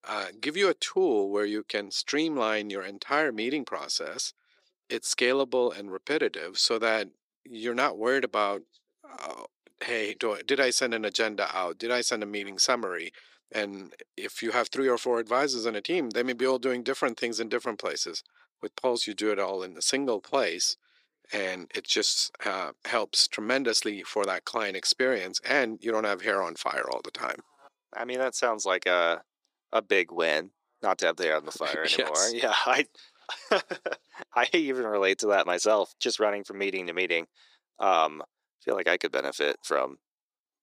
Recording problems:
thin; somewhat; fading below 350 Hz

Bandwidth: 14.5 kHz